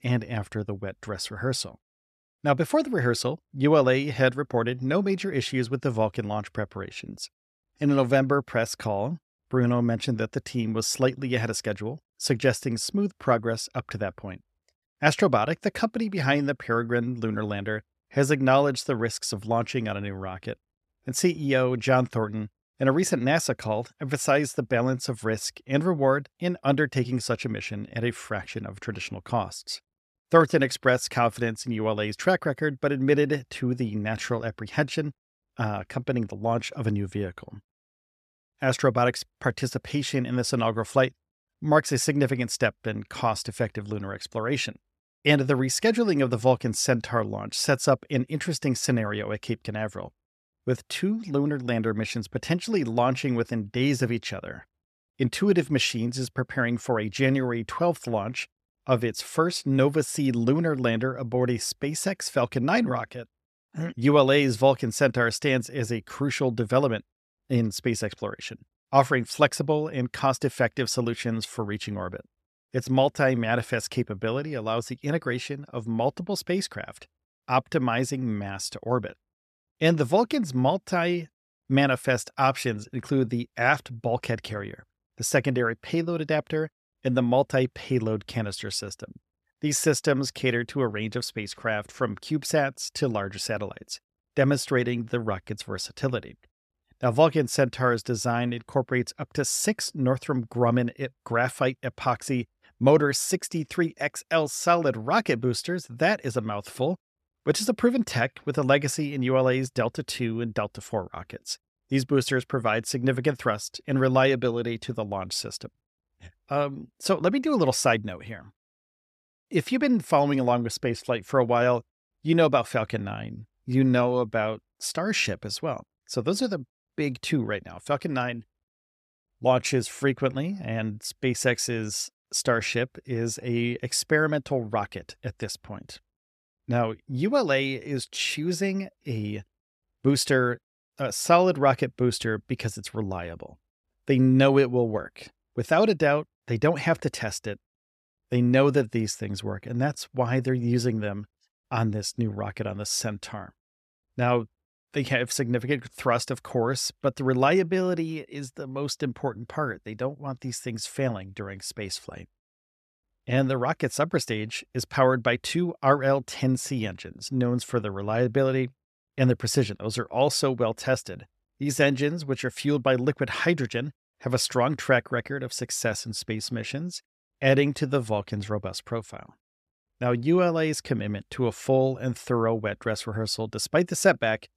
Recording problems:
none

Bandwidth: 14 kHz